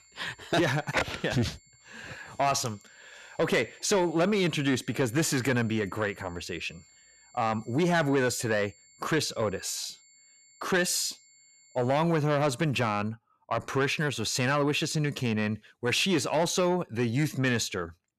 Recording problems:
distortion; slight; 10 dB below the speech
high-pitched whine; faint; until 12 s; 7.5 kHz, 30 dB below the speech

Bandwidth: 13.5 kHz